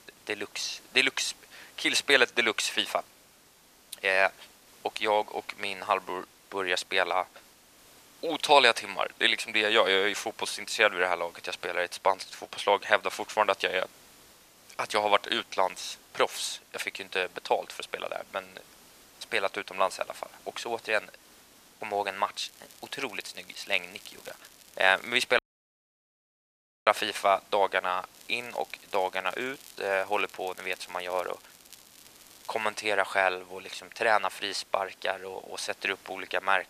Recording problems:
thin; very; fading below 750 Hz
hiss; faint; throughout; 25 dB below the speech
crackling; faint; from 22 to 25 s and from 28 to 33 s; 25 dB below the speech
audio cutting out; at 25 s for 1.5 s

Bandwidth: 14.5 kHz